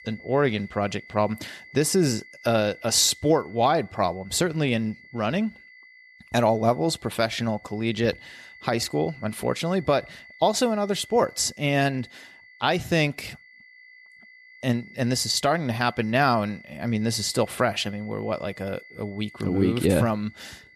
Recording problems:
high-pitched whine; faint; throughout; 2 kHz, 20 dB below the speech

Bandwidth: 13.5 kHz